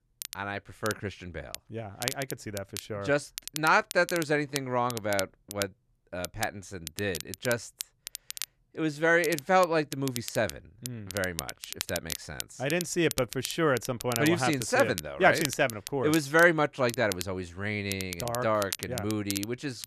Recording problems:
crackle, like an old record; loud; 10 dB below the speech

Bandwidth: 13.5 kHz